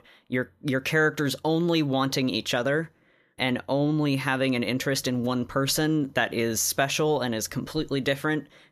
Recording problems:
none

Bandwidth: 14.5 kHz